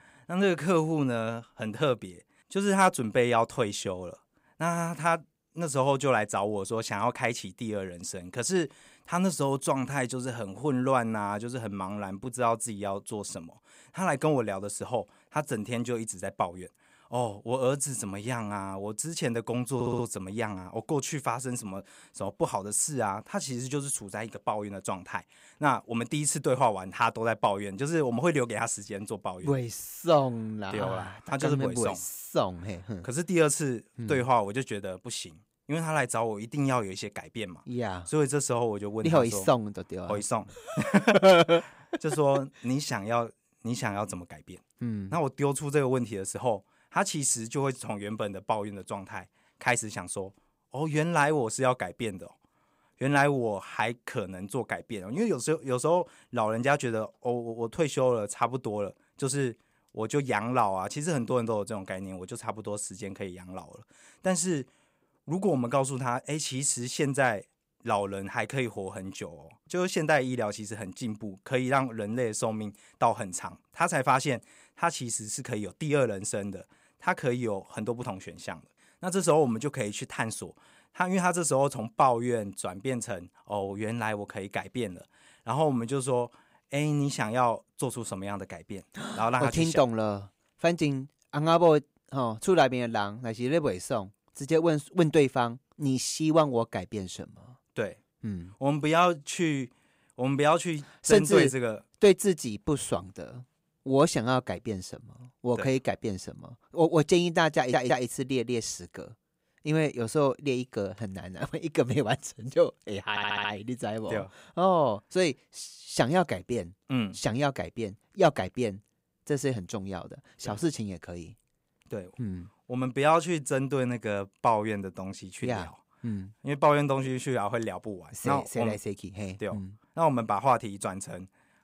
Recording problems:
audio stuttering; at 20 s, at 1:48 and at 1:53

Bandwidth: 15.5 kHz